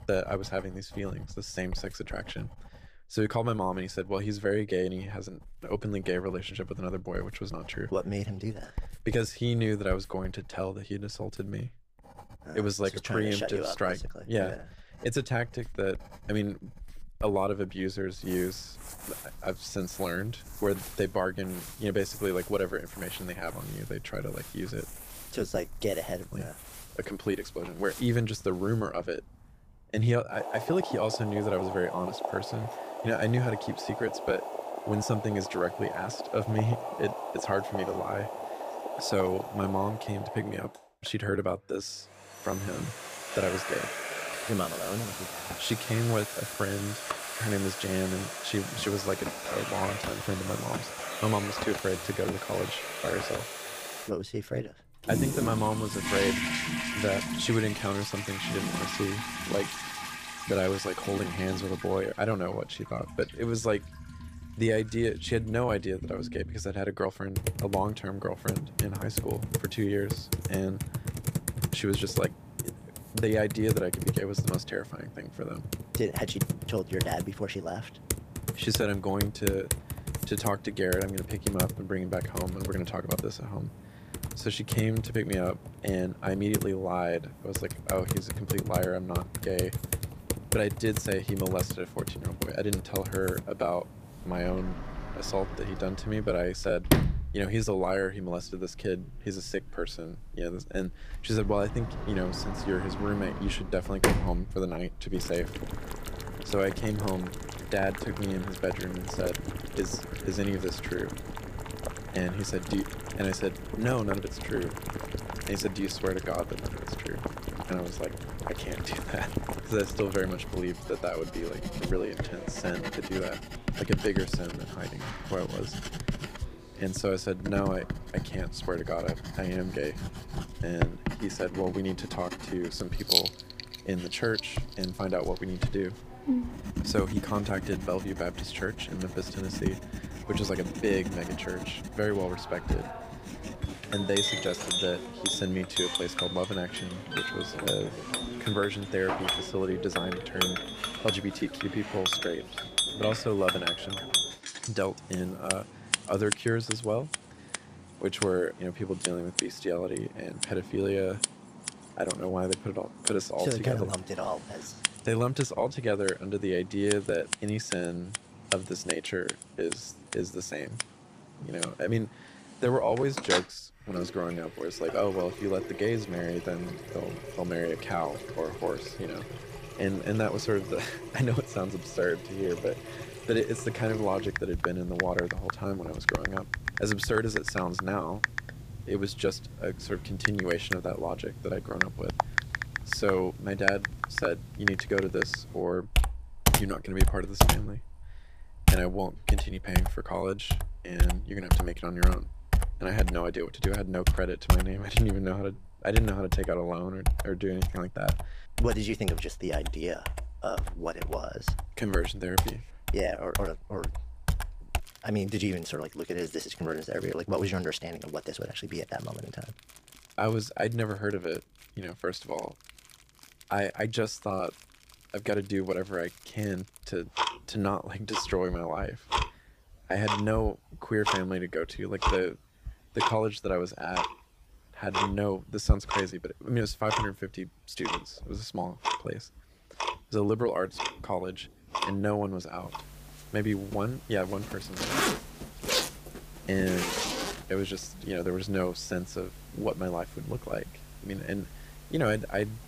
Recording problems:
household noises; loud; throughout; 2 dB below the speech

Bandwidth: 15 kHz